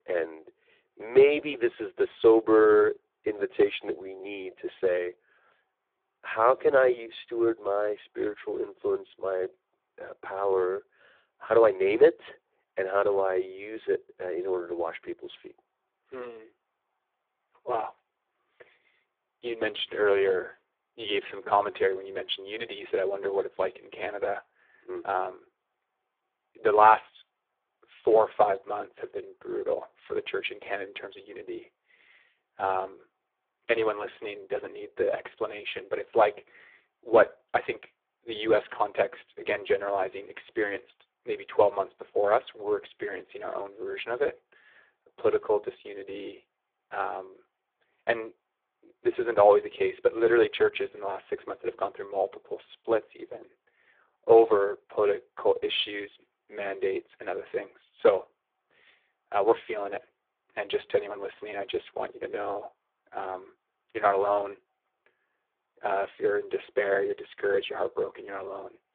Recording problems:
phone-call audio; poor line

